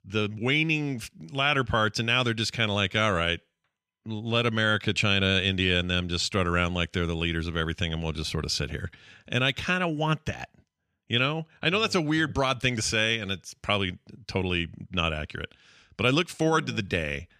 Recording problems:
none

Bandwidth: 14.5 kHz